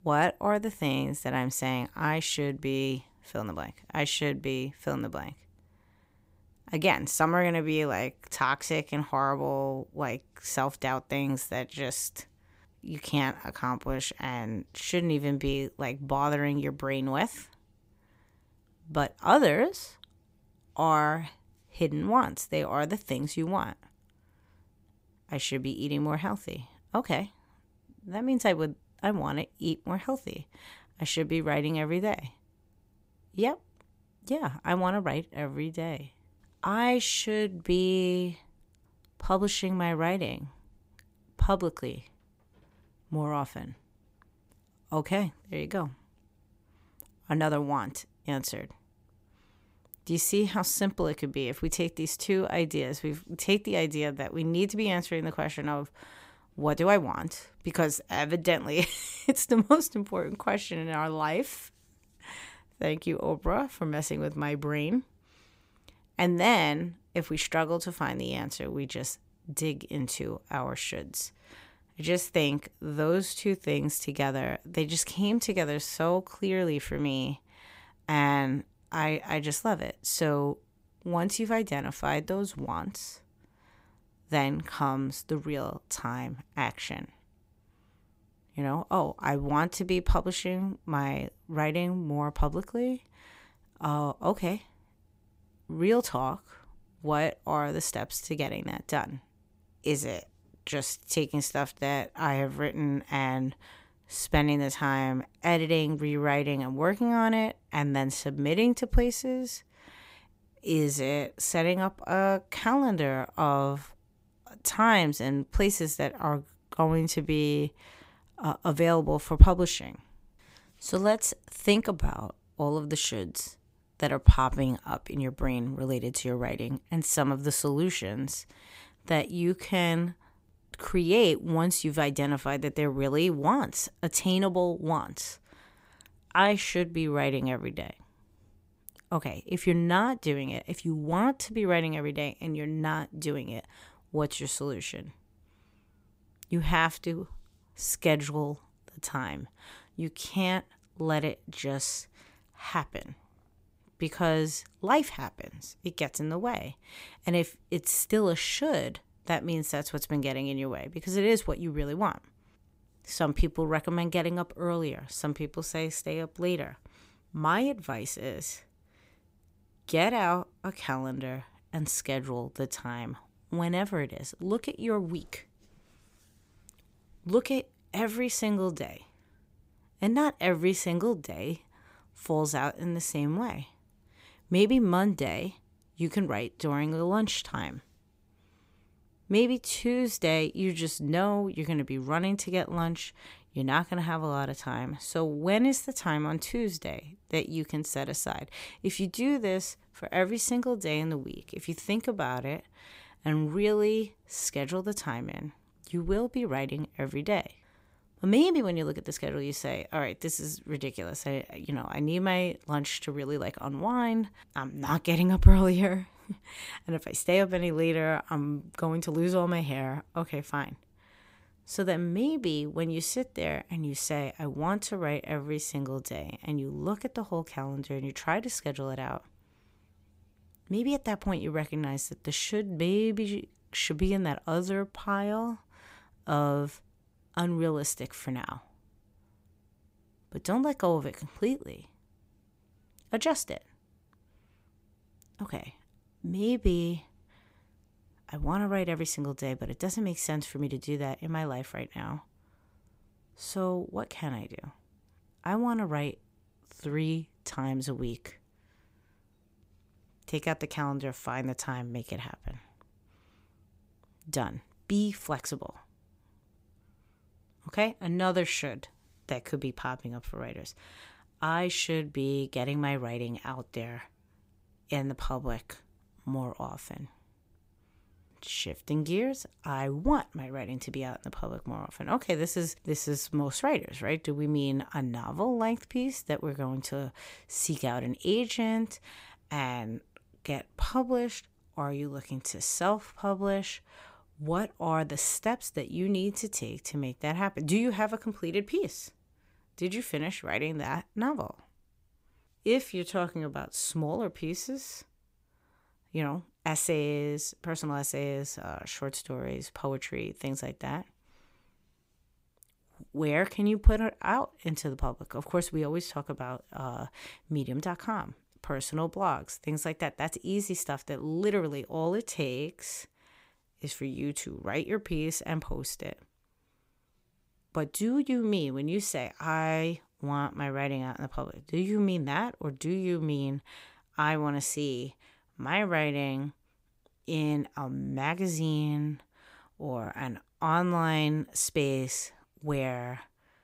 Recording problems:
none

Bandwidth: 15.5 kHz